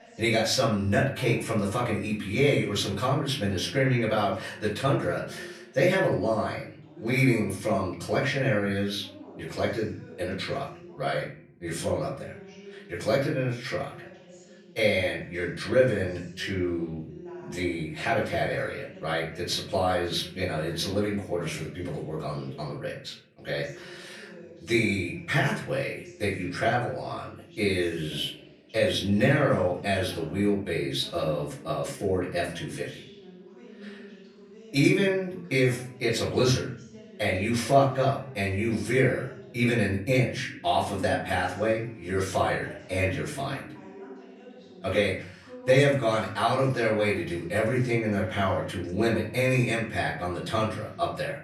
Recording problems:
off-mic speech; far
room echo; slight; dies away in 0.5 s
voice in the background; faint; throughout; 20 dB below the speech

